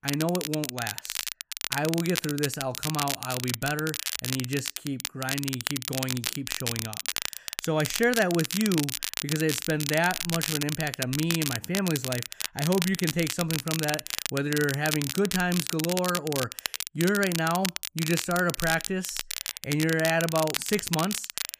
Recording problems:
crackle, like an old record; loud; 3 dB below the speech

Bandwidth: 15 kHz